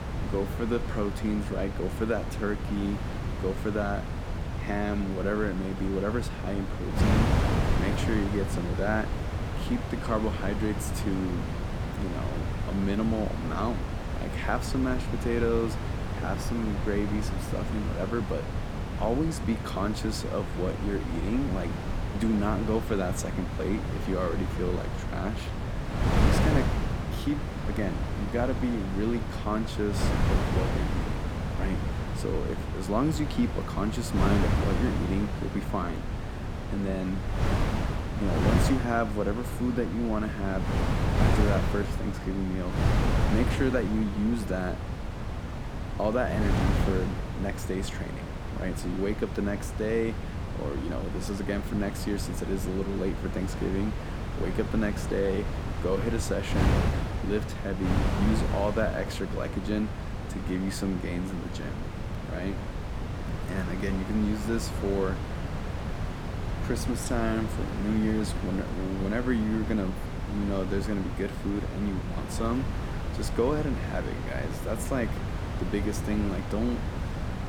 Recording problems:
wind noise on the microphone; heavy; 3 dB below the speech

